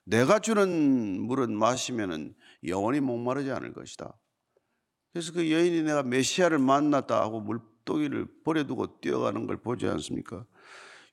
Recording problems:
uneven, jittery; strongly; from 0.5 to 11 s

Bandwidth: 17 kHz